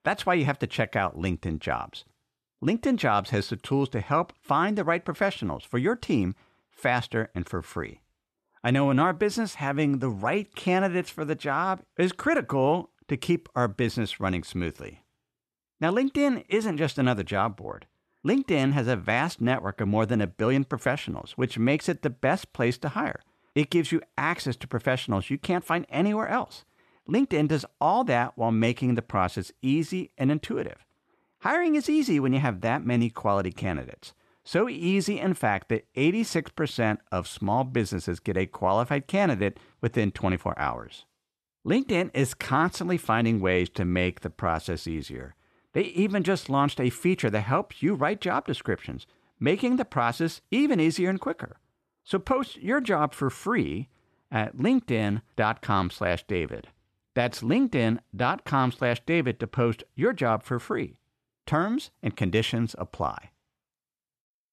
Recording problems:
none

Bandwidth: 13.5 kHz